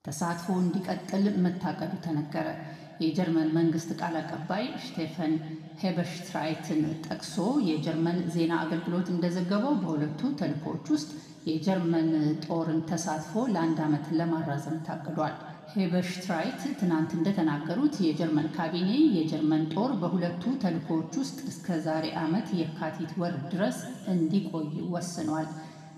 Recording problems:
room echo; noticeable; dies away in 2.1 s
off-mic speech; somewhat distant

